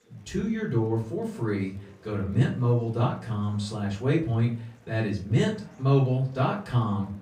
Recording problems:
off-mic speech; far
room echo; slight; dies away in 0.3 s
chatter from many people; faint; throughout; 30 dB below the speech

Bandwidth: 15.5 kHz